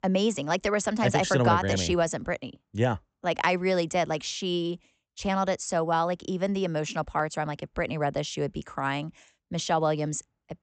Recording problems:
high frequencies cut off; noticeable; nothing above 8 kHz

